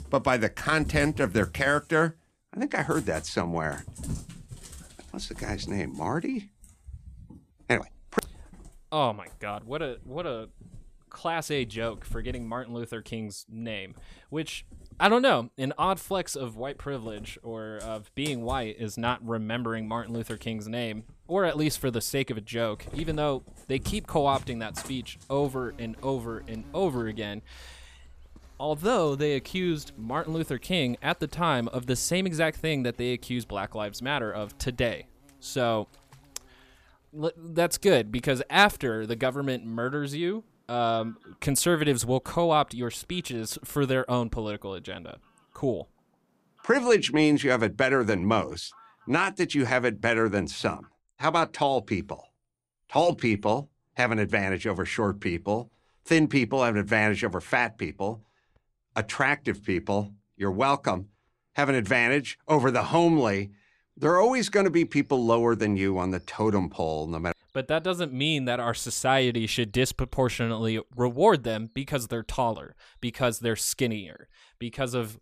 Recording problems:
animal sounds; noticeable; throughout; 20 dB below the speech

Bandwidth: 14.5 kHz